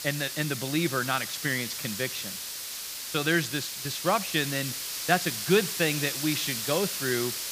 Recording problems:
hiss; loud; throughout; 3 dB below the speech

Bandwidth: 15 kHz